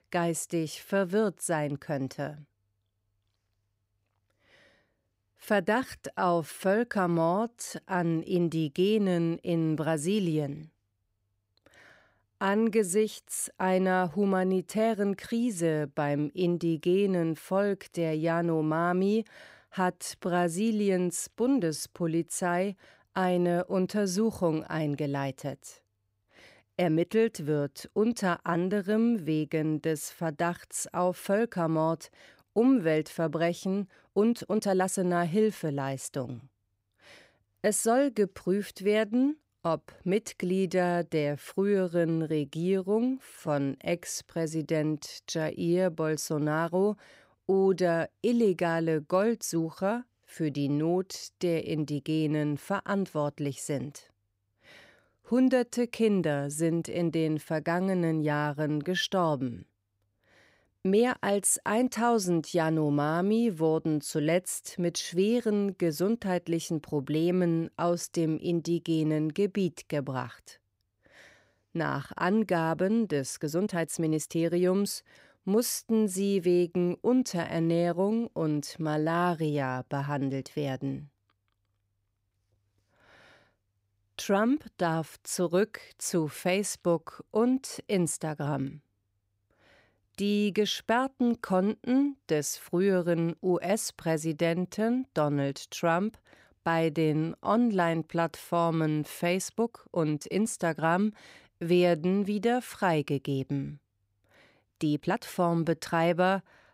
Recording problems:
uneven, jittery; strongly; from 6 s to 1:45

